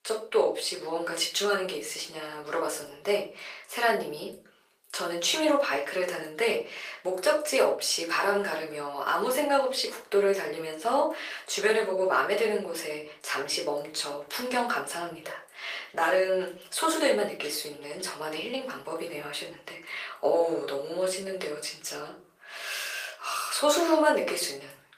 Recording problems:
off-mic speech; far
thin; very; fading below 450 Hz
room echo; slight; dies away in 0.3 s
garbled, watery; slightly; nothing above 15 kHz

